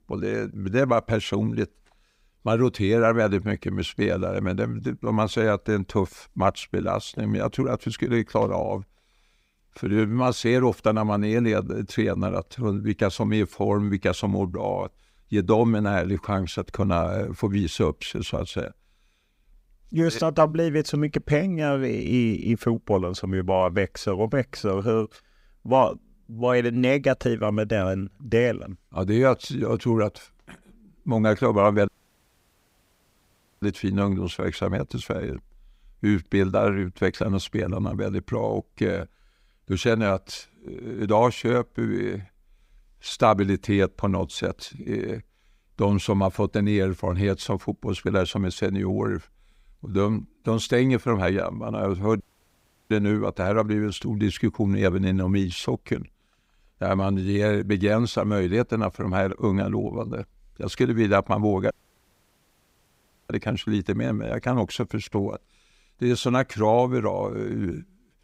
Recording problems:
audio cutting out; at 32 s for 1.5 s, at 52 s for 0.5 s and at 1:02 for 1.5 s

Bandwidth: 15.5 kHz